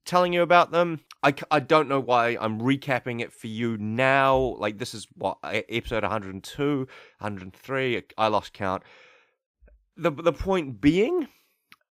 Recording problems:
none

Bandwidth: 15.5 kHz